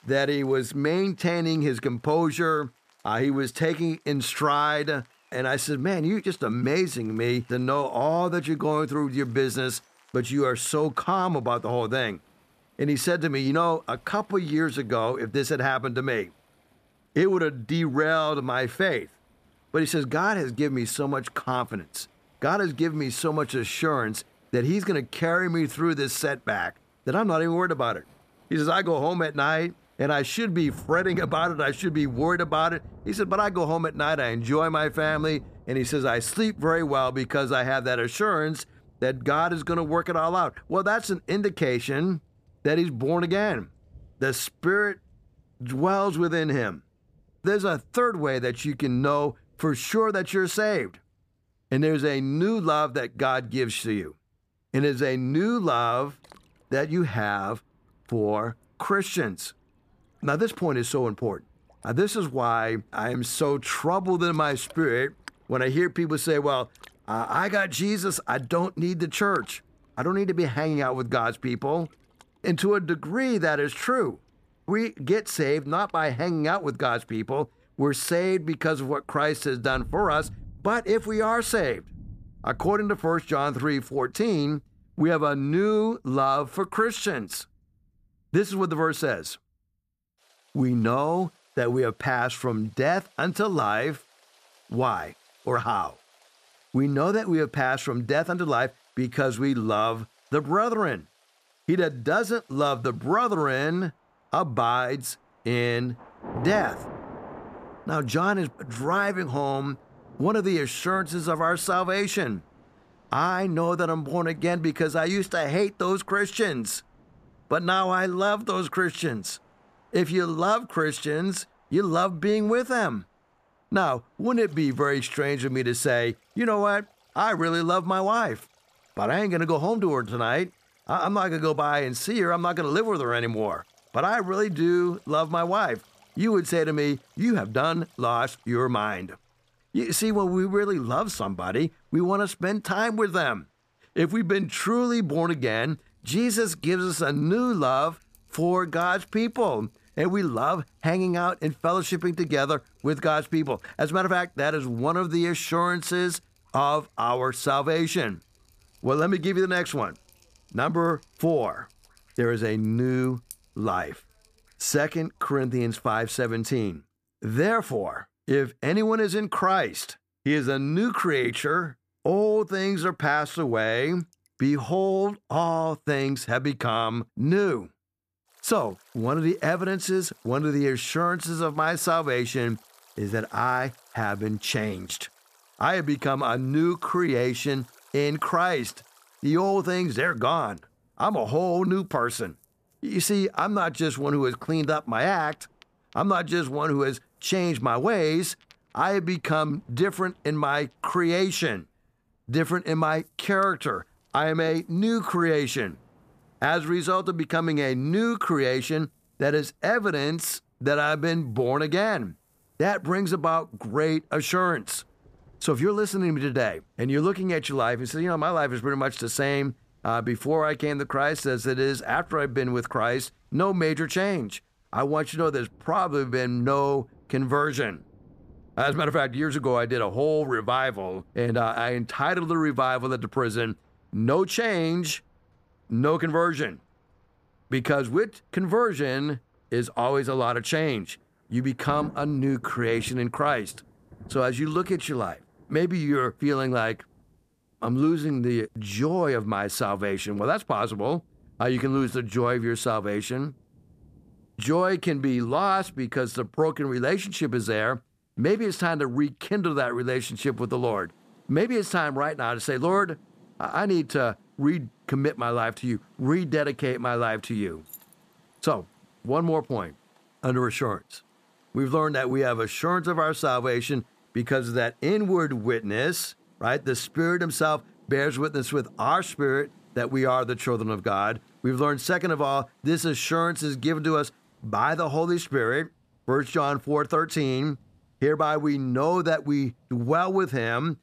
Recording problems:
rain or running water; faint; throughout; 25 dB below the speech
jangling keys; faint; at 4:28; peak 20 dB below the speech

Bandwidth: 14.5 kHz